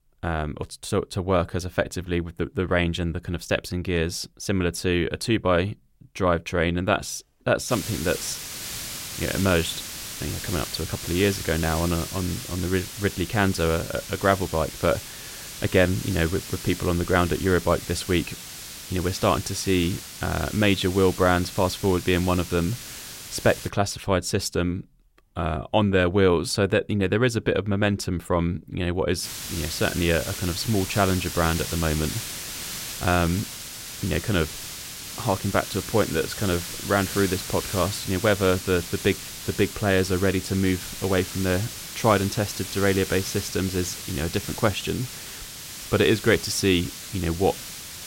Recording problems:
hiss; loud; from 7.5 to 24 s and from 29 s on; 9 dB below the speech

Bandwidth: 16 kHz